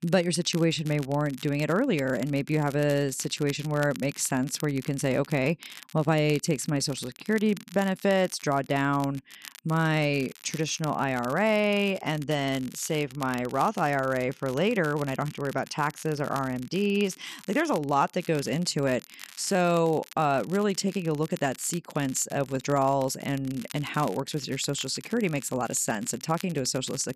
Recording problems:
crackle, like an old record; noticeable; 20 dB below the speech

